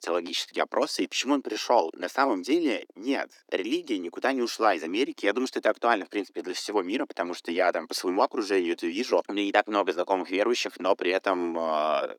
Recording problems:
thin; somewhat; fading below 300 Hz

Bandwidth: 18 kHz